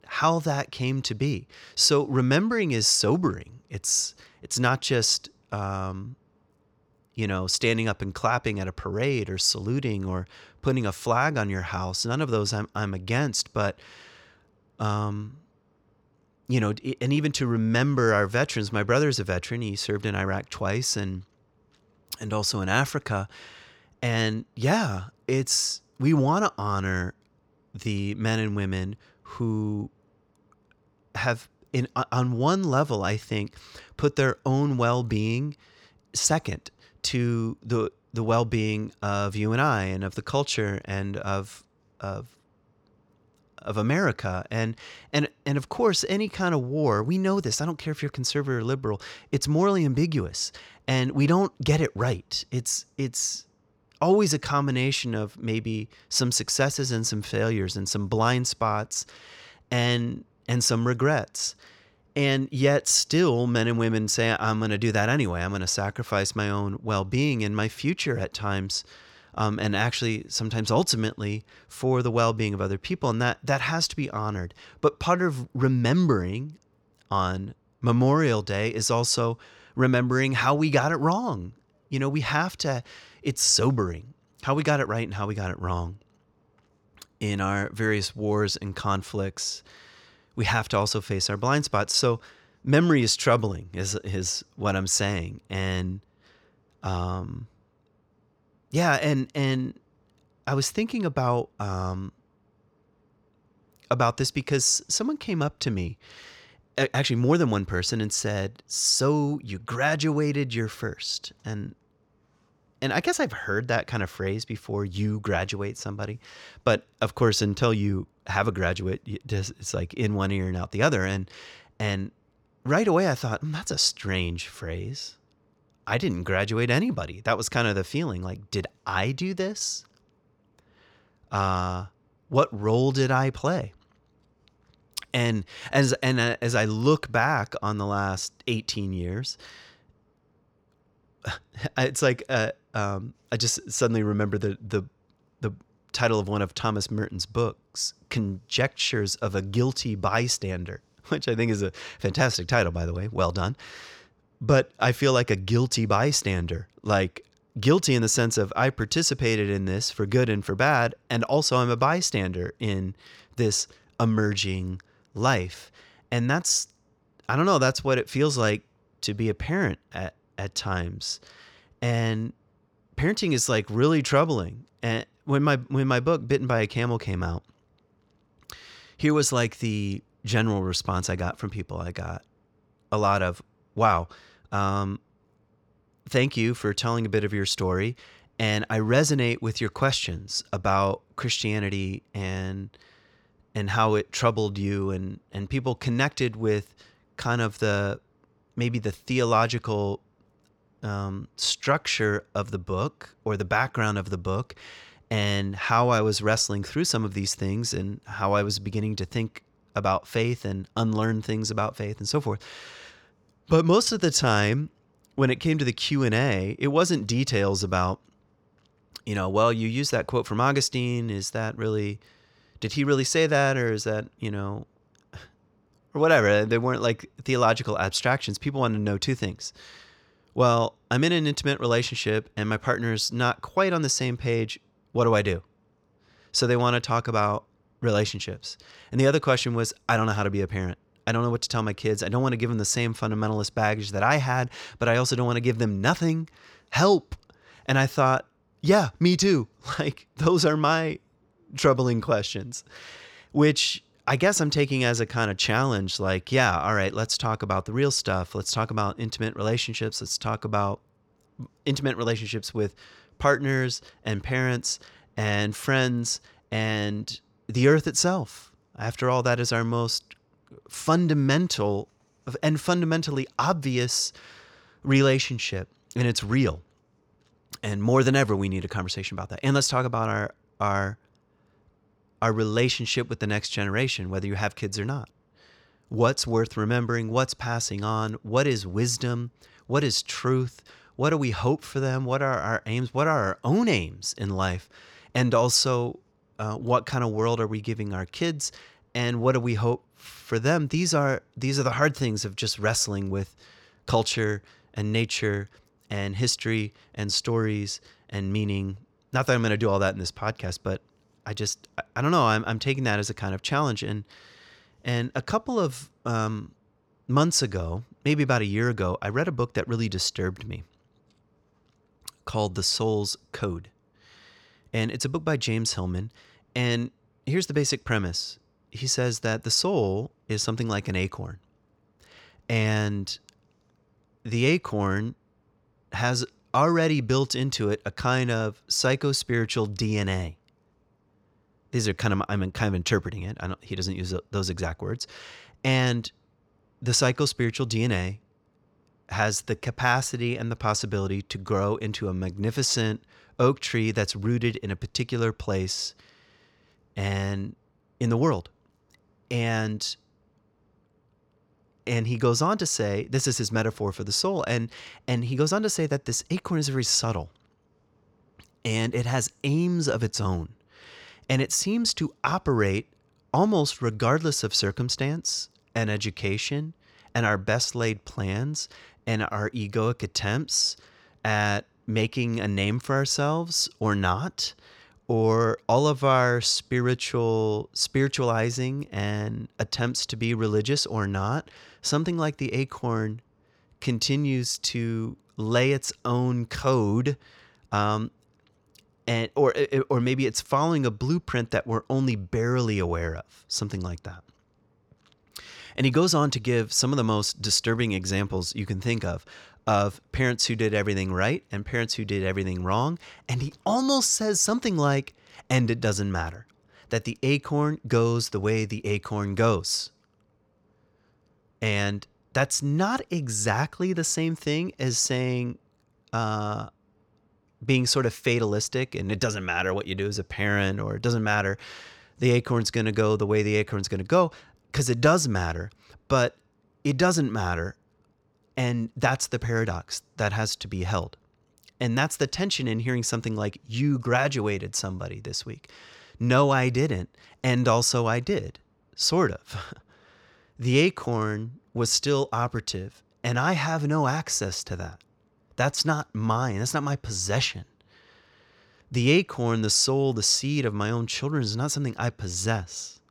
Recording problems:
none

